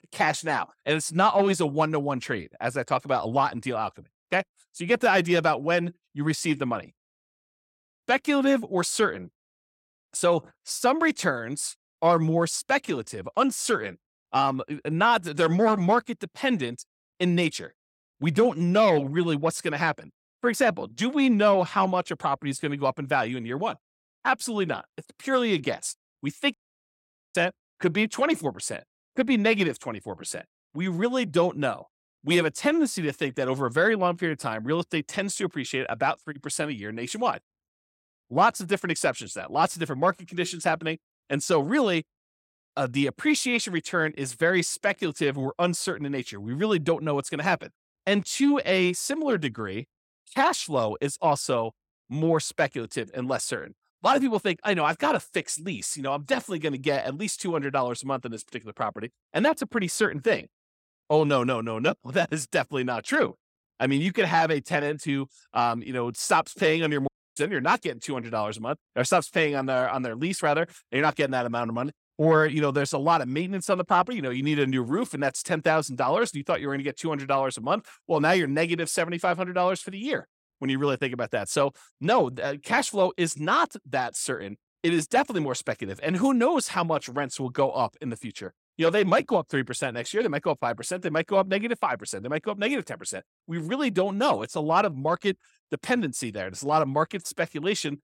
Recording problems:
audio cutting out; at 27 s for 1 s and at 1:07

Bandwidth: 16.5 kHz